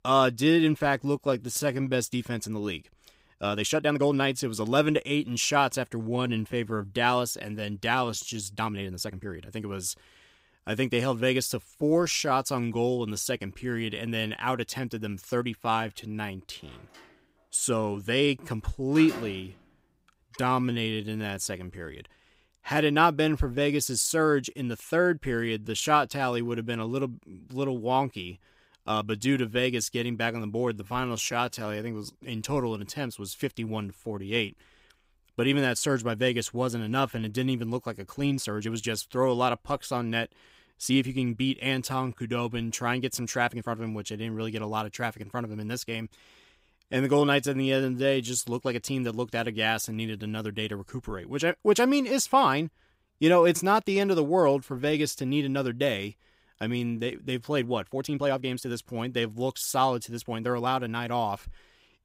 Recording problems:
uneven, jittery; strongly; from 1 s to 1:01
door banging; faint; from 17 to 20 s; peak 10 dB below the speech

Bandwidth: 15.5 kHz